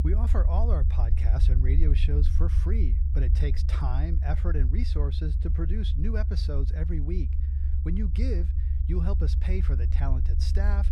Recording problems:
low rumble; loud; throughout; 6 dB below the speech

